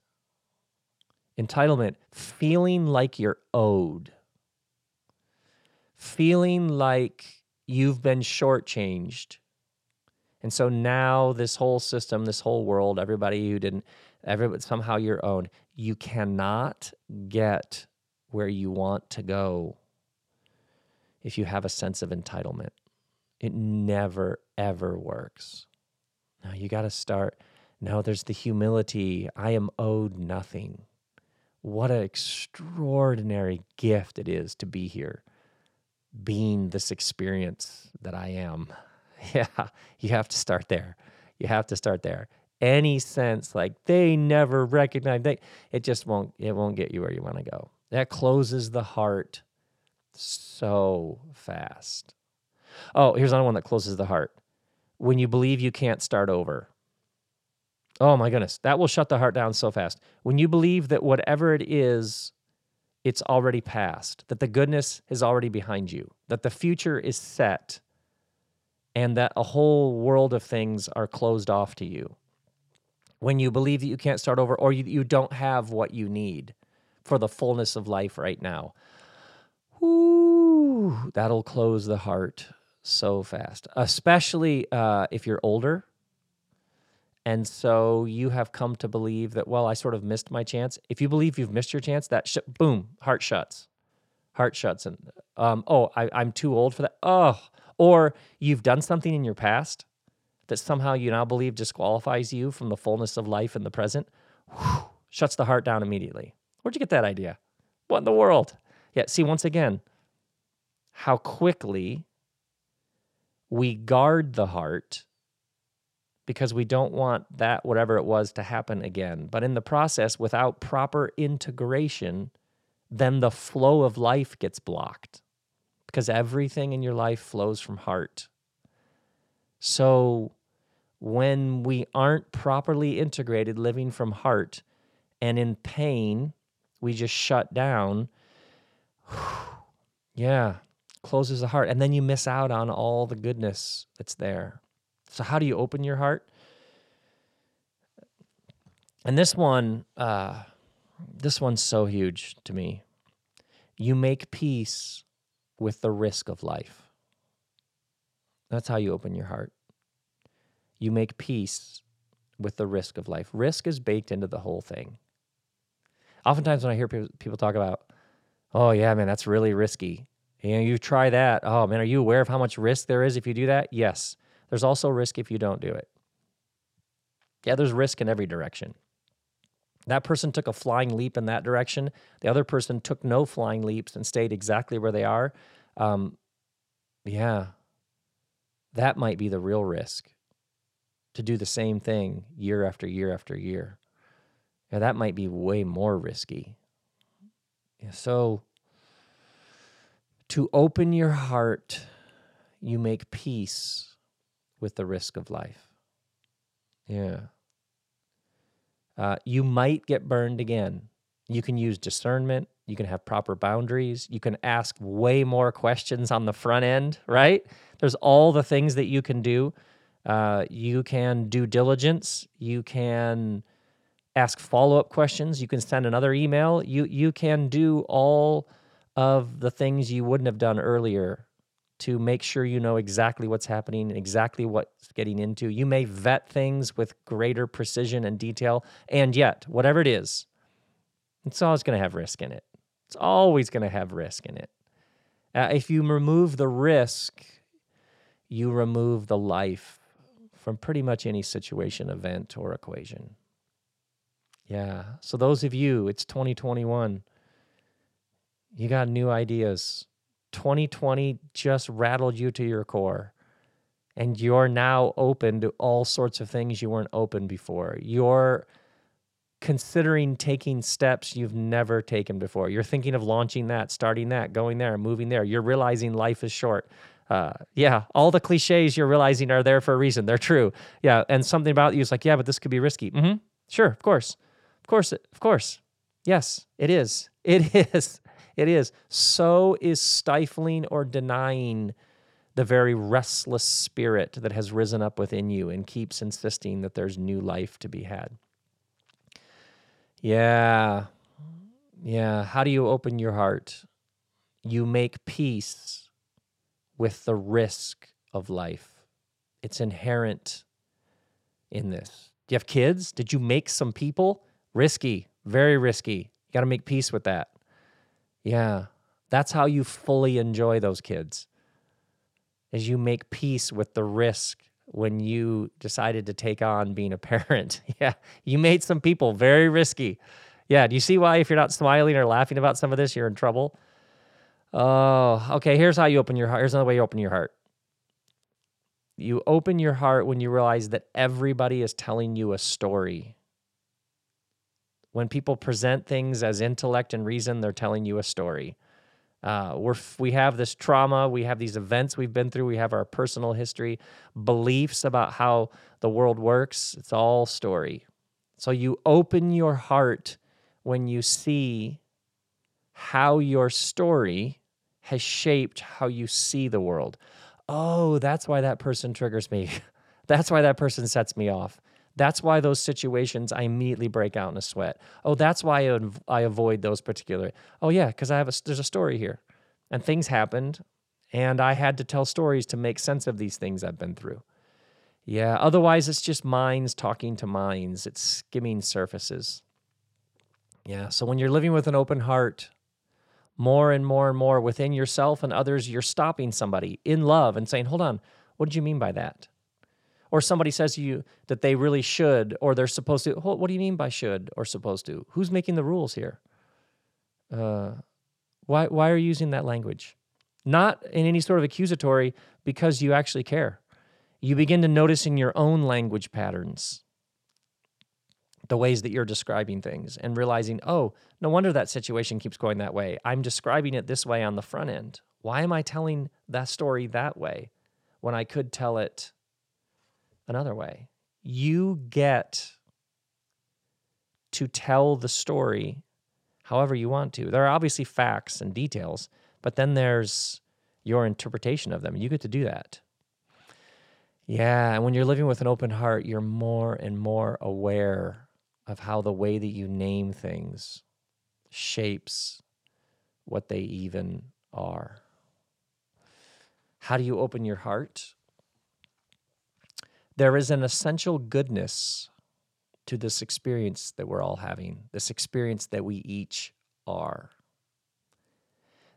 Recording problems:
none

